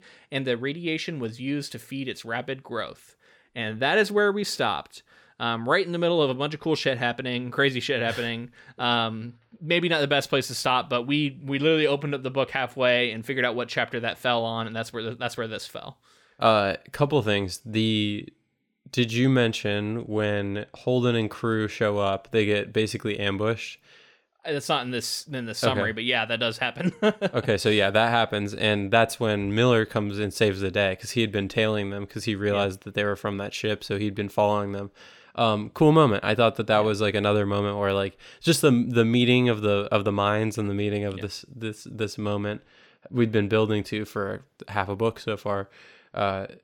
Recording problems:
none

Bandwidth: 17.5 kHz